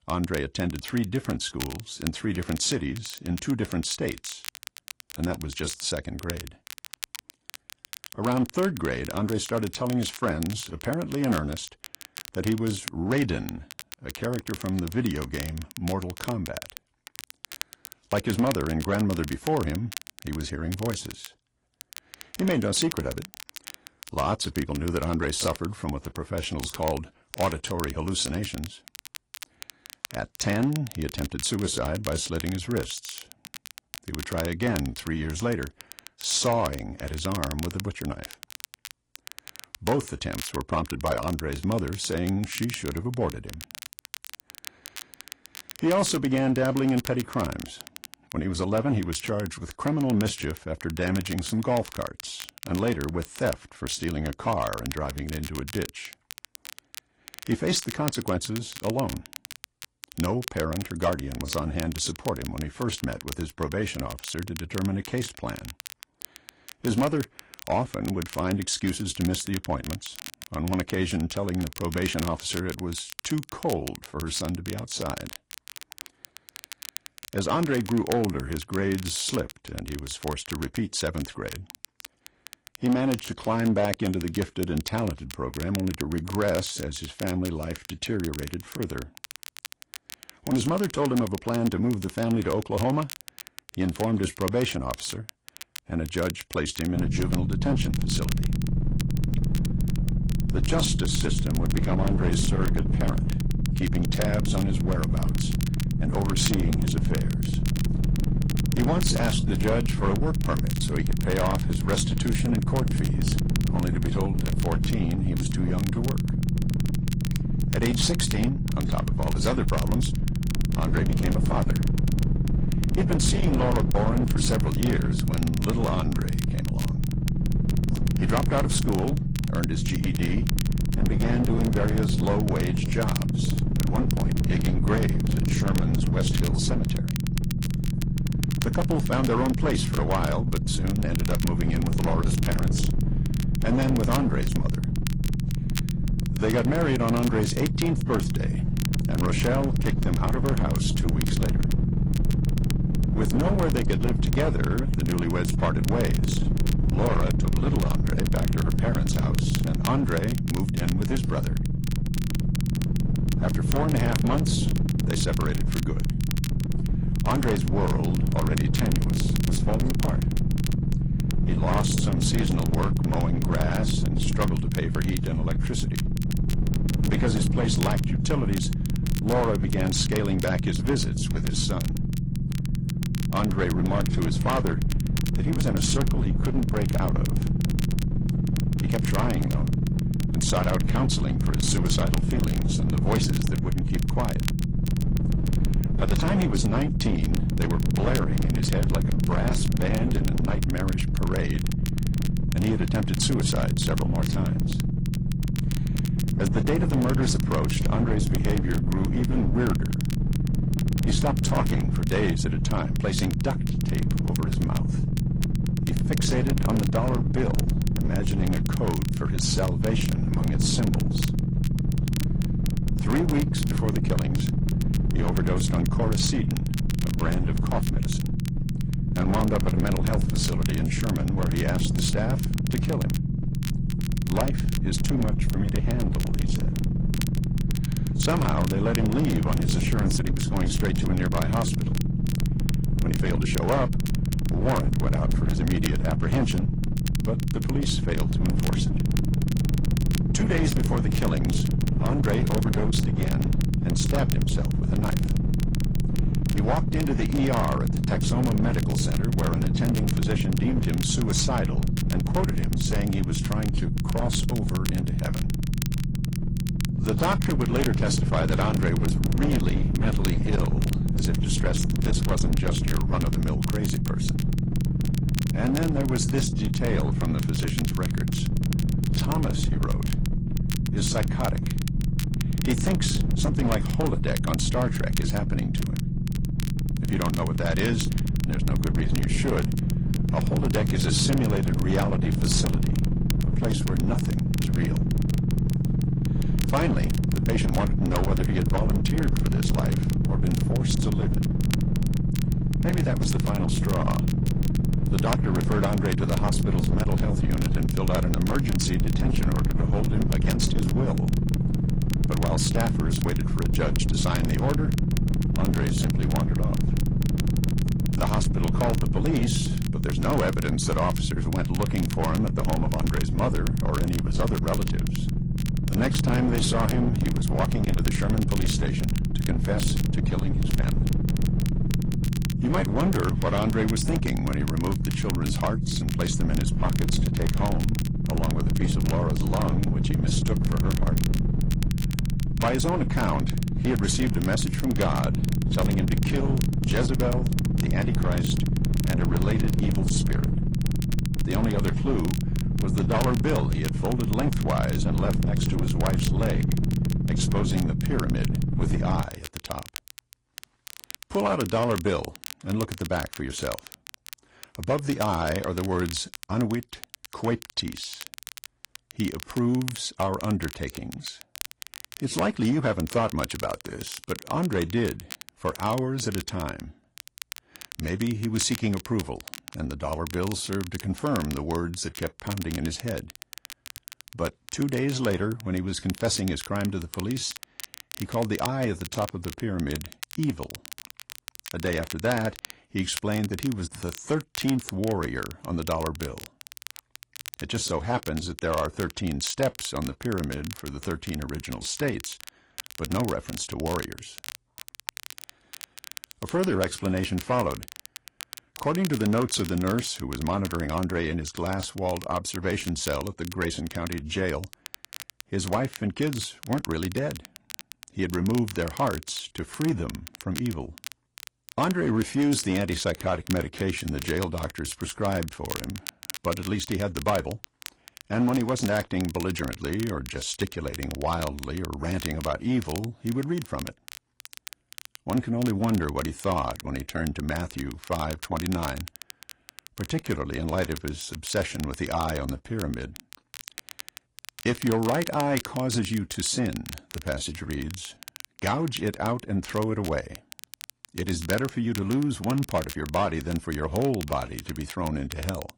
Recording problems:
distortion; slight; 11% of the sound clipped
garbled, watery; slightly; nothing above 10.5 kHz
low rumble; loud; from 1:37 to 5:59; 5 dB below the speech
crackle, like an old record; noticeable; 10 dB below the speech

